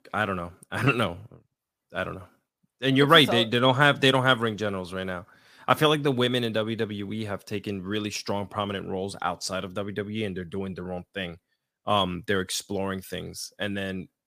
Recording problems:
none

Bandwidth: 15 kHz